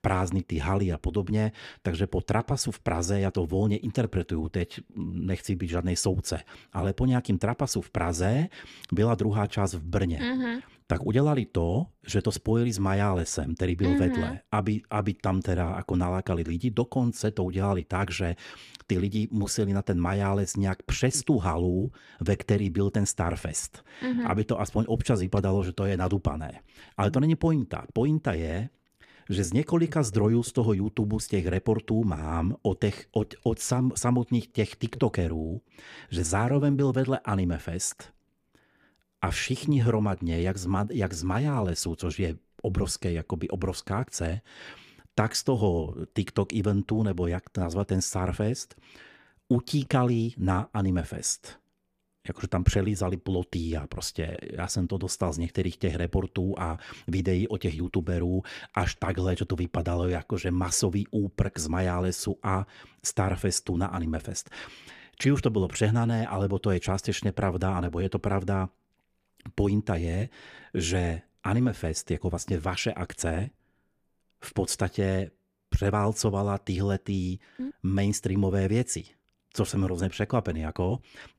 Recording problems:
none

